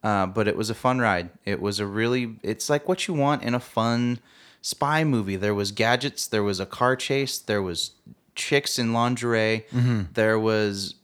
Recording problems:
none

